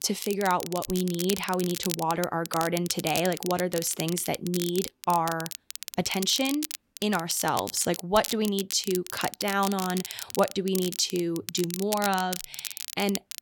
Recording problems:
crackle, like an old record; loud; 8 dB below the speech

